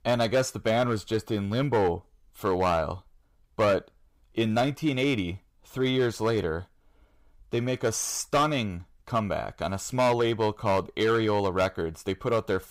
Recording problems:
distortion; slight; 5% of the sound clipped

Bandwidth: 15.5 kHz